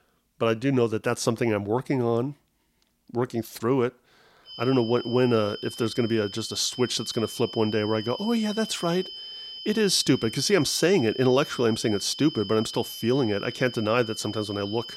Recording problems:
high-pitched whine; noticeable; from 4.5 s on; 3 kHz, 10 dB below the speech

